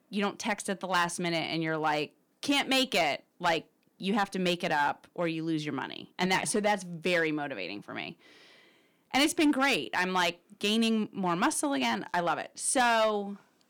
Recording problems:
distortion; slight; 3% of the sound clipped

